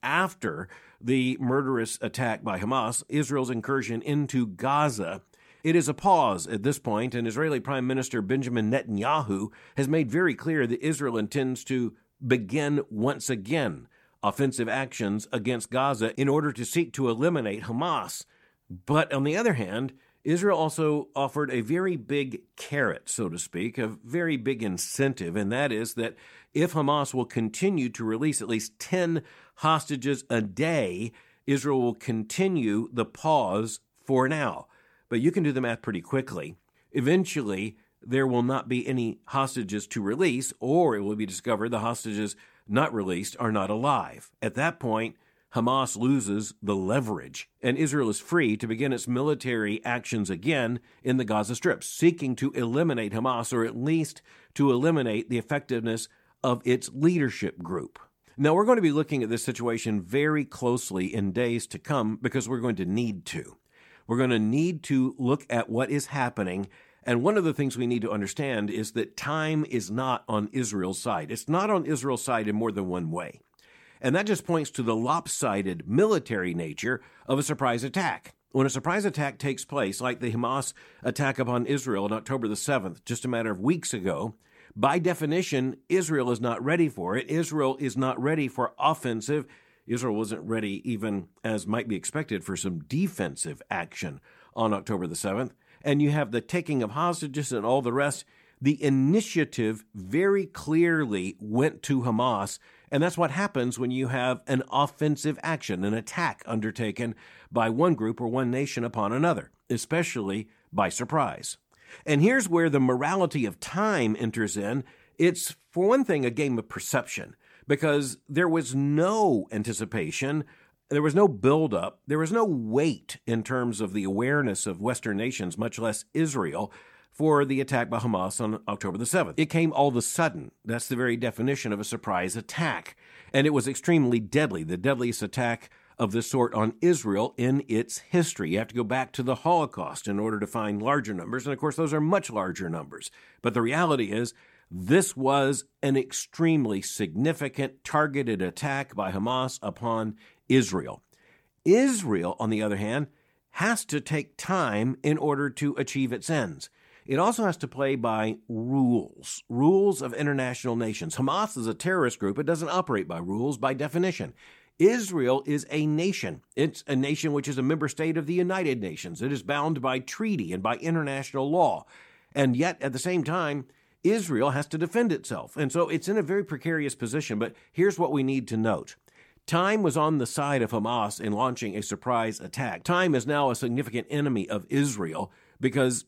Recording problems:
none

